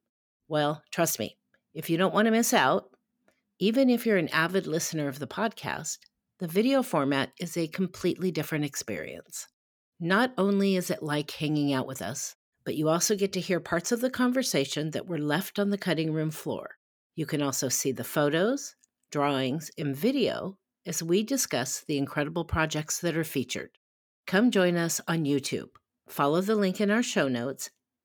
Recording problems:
none

